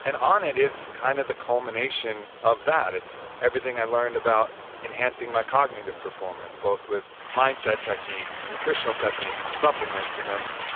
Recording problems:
phone-call audio; poor line; nothing above 3.5 kHz
rain or running water; loud; throughout; 10 dB below the speech
hiss; faint; throughout; 25 dB below the speech

